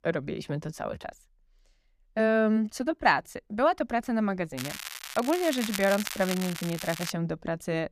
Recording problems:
crackling; loud; from 4.5 to 7 s; 8 dB below the speech

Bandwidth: 14.5 kHz